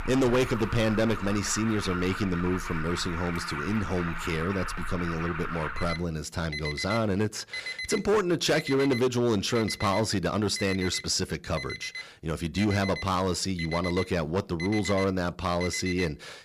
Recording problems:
distortion; slight; 6% of the sound clipped
alarms or sirens; loud; throughout; 8 dB below the speech

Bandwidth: 14.5 kHz